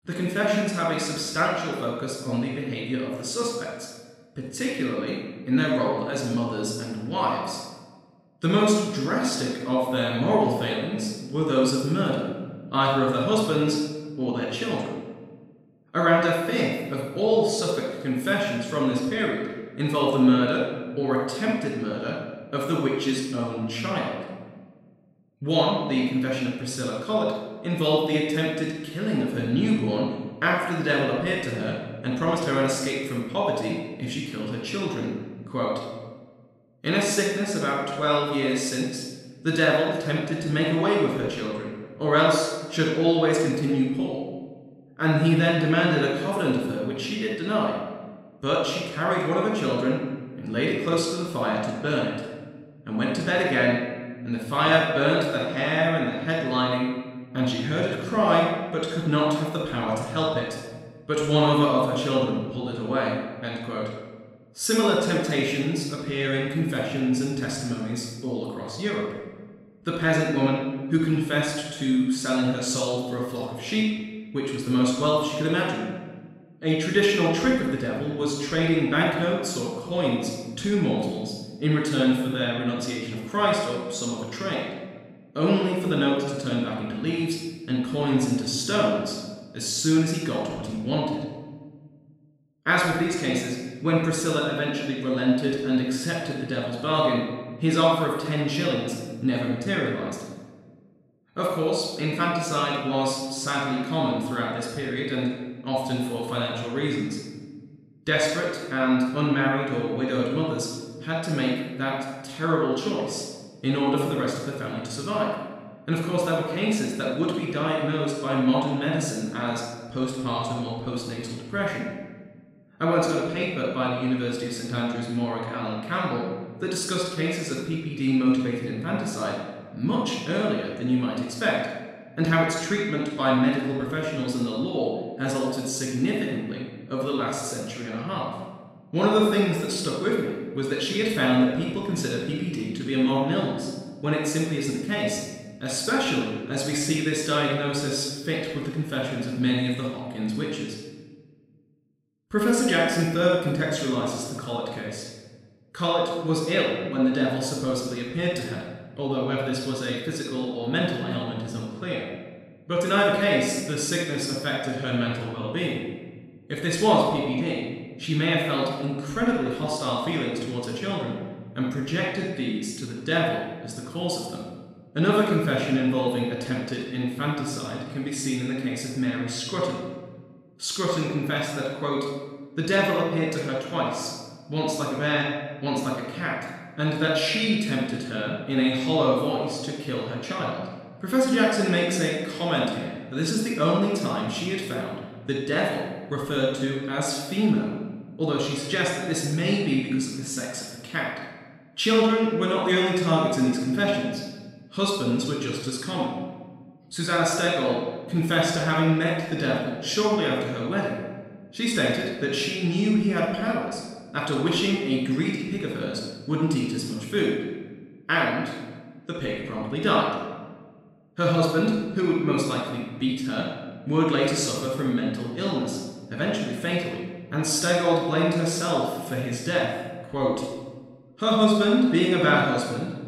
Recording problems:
room echo; strong; dies away in 1.2 s
off-mic speech; far

